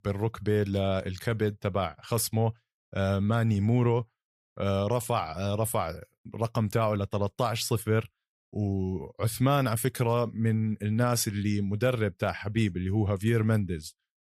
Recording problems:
none

